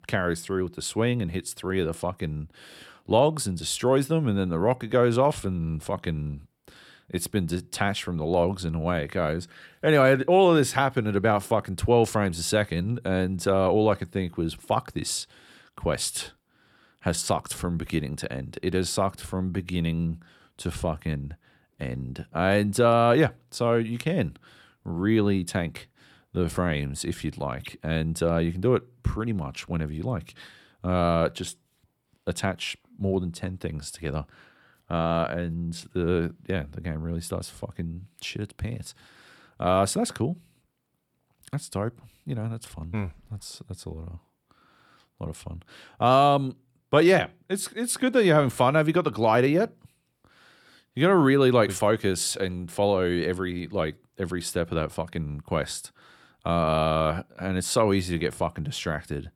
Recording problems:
none

